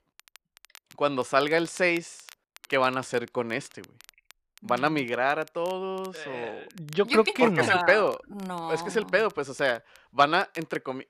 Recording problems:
crackle, like an old record; faint; 25 dB below the speech

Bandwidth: 14 kHz